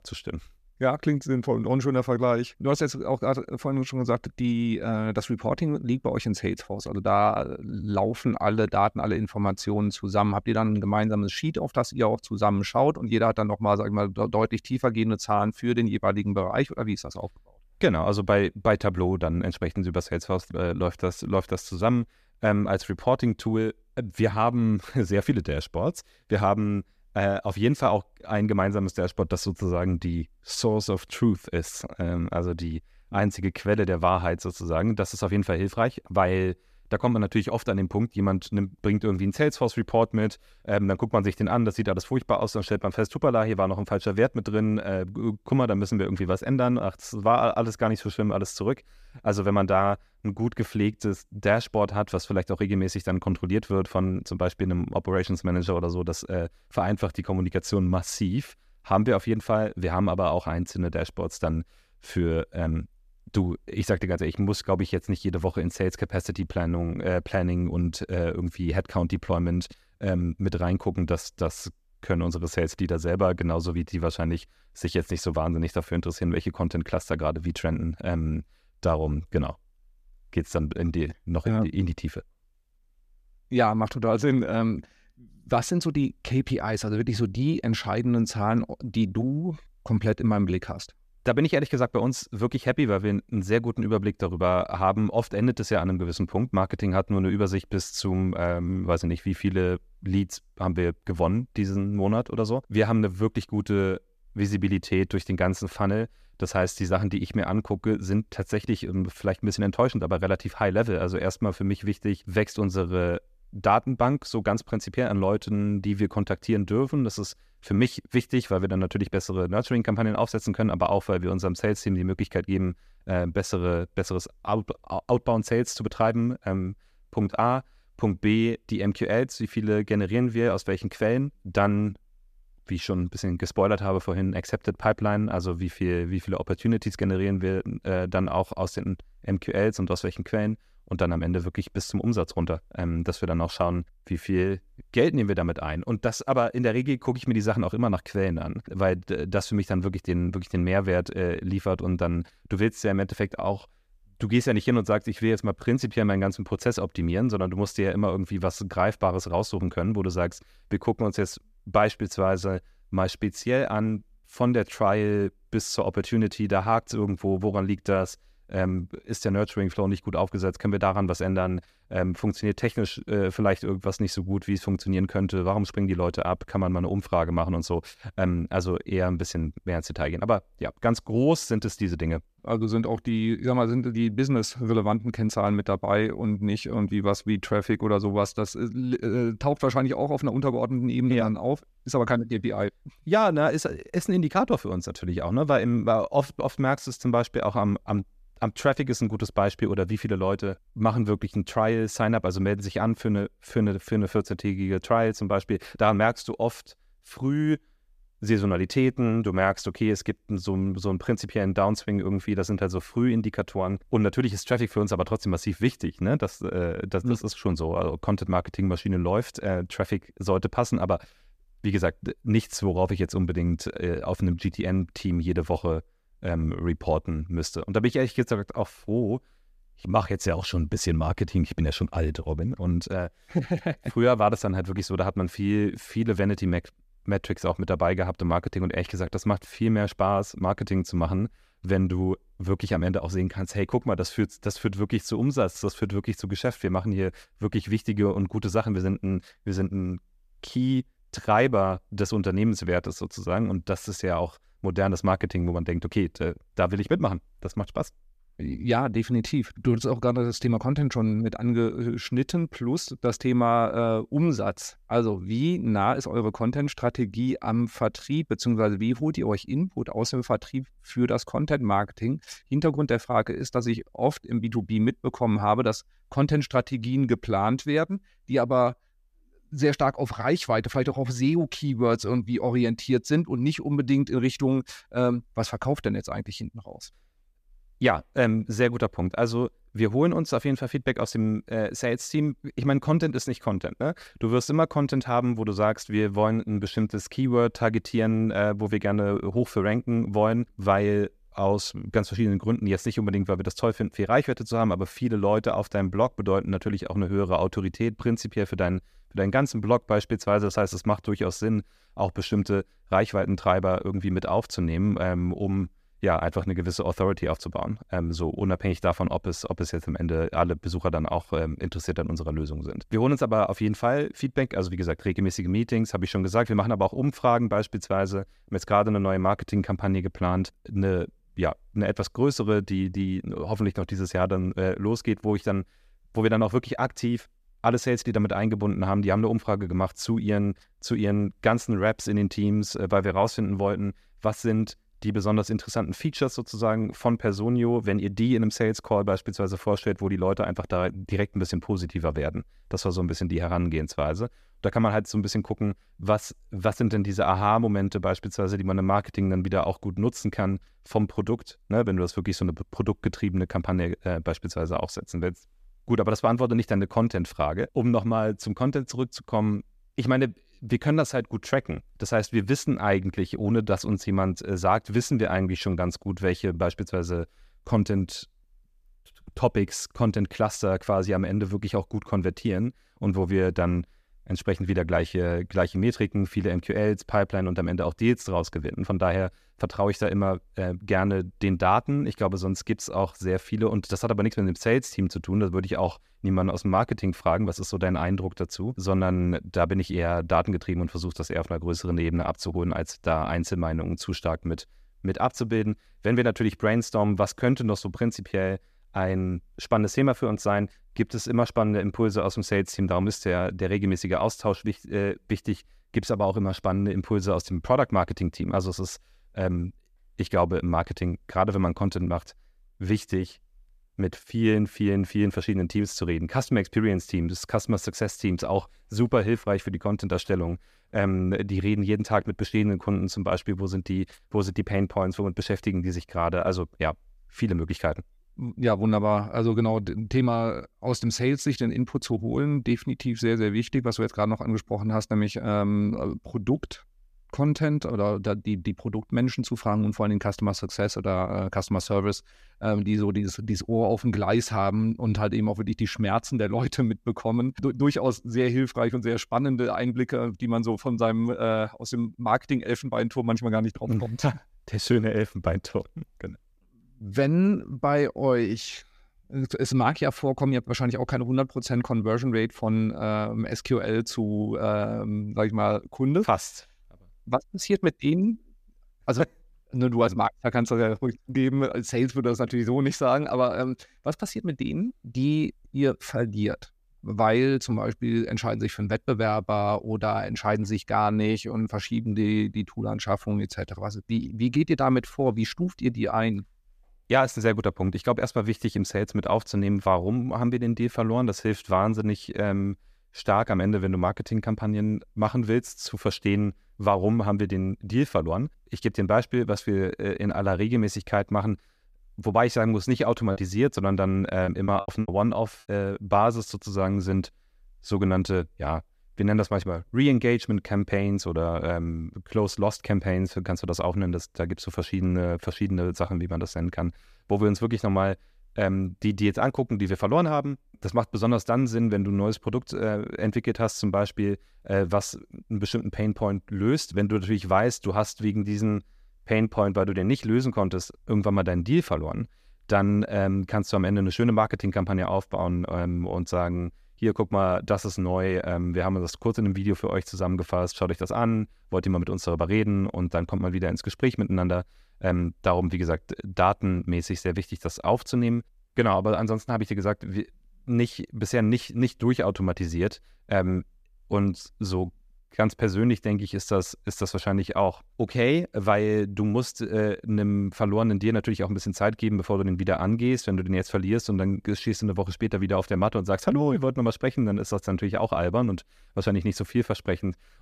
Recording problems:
choppy; very; from 8:33 to 8:35; 13% of the speech affected

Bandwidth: 14.5 kHz